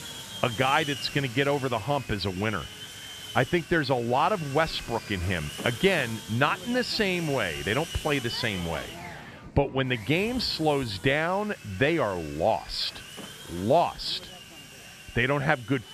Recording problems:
machinery noise; noticeable; throughout; 10 dB below the speech

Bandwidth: 14.5 kHz